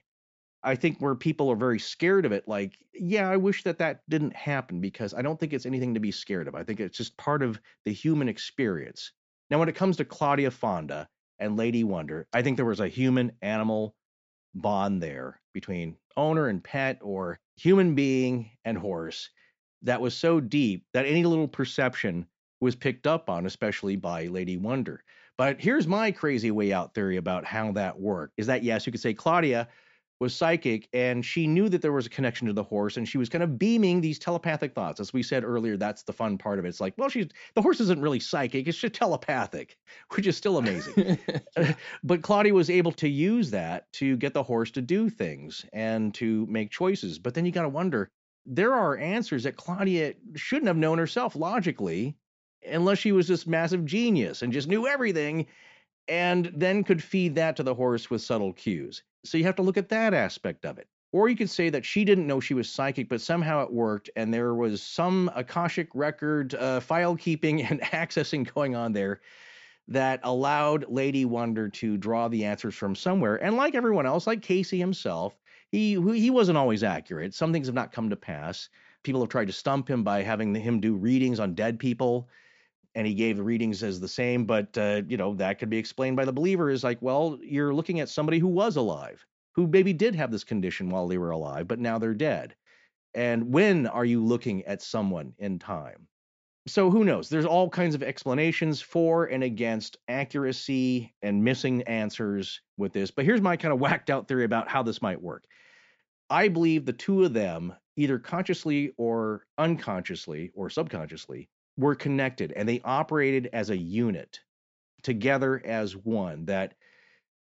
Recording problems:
high frequencies cut off; noticeable; nothing above 8 kHz

